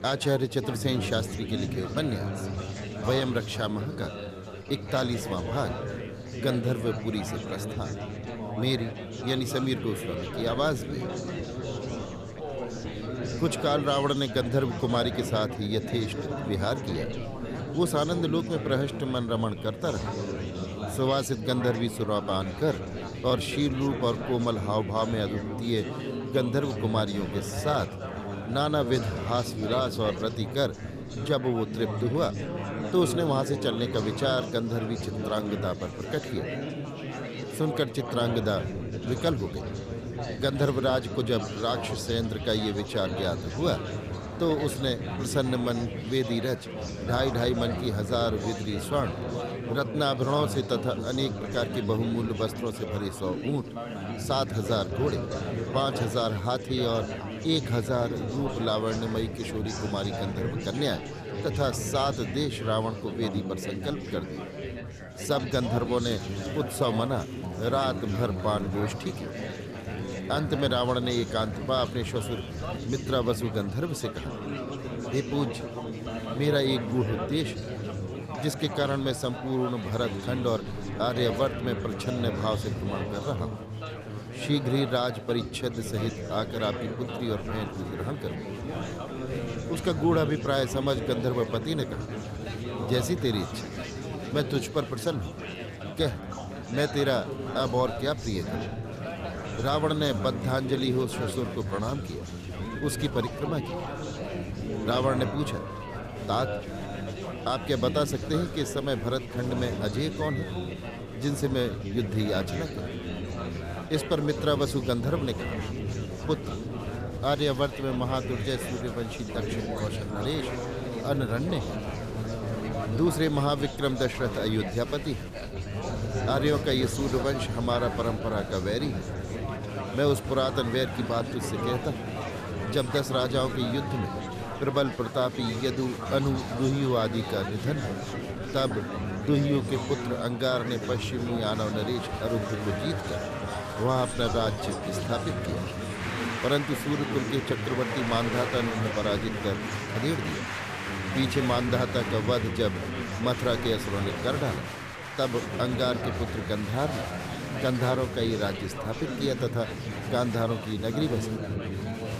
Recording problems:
chatter from many people; loud; throughout; 5 dB below the speech

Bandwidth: 14.5 kHz